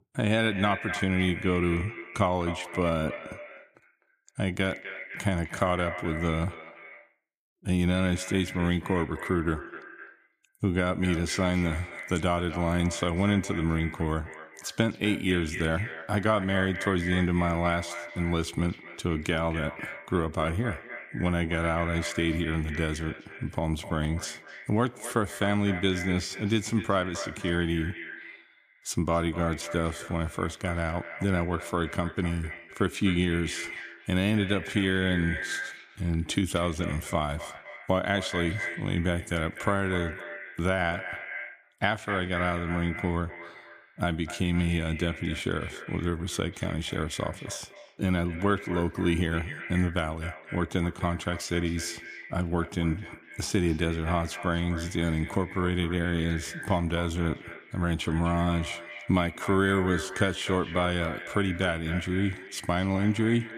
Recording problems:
echo of what is said; strong; throughout; 250 ms later, 10 dB below the speech

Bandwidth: 15 kHz